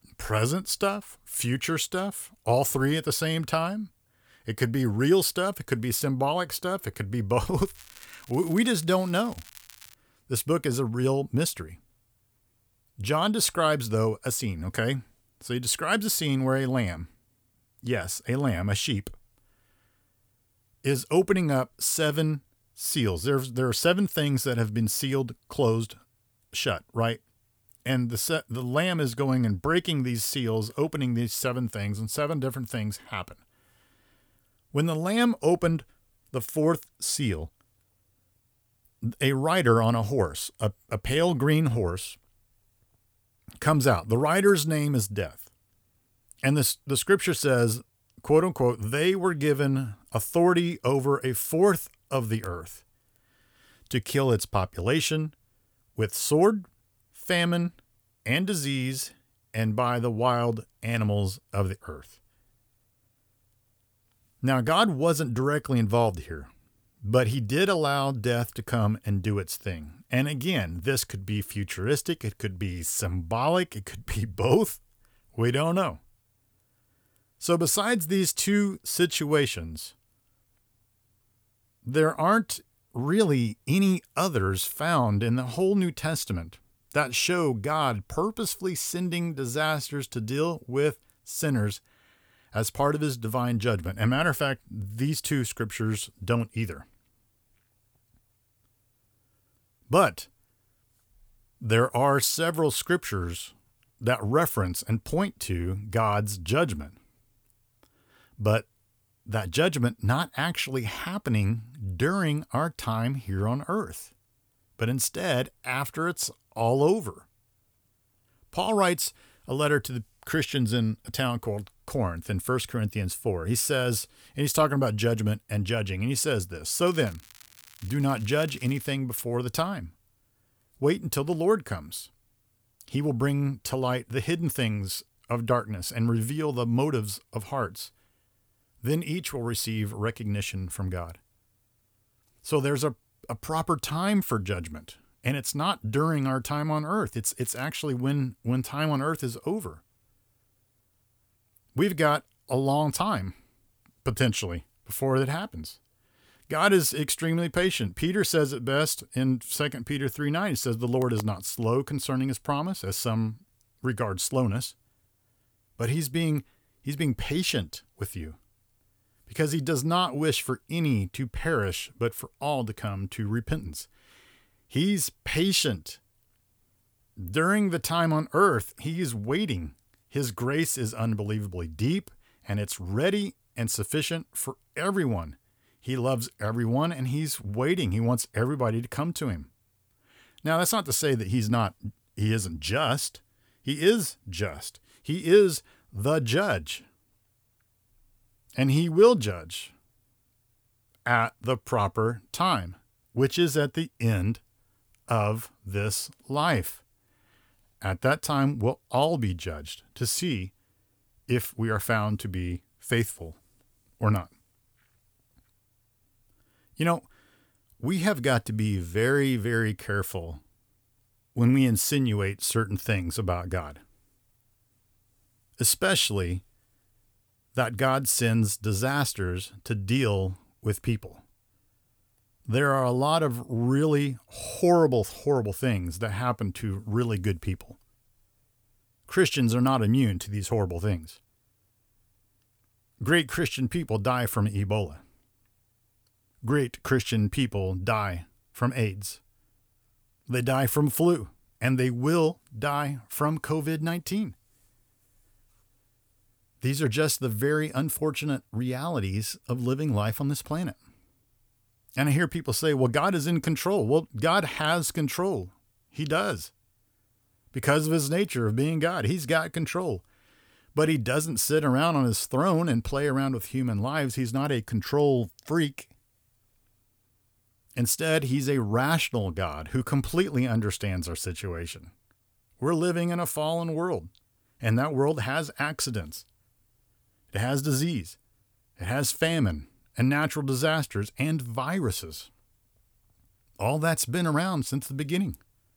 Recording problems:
crackling; faint; from 7.5 to 10 s, from 2:07 to 2:09 and at 2:27; 20 dB below the speech

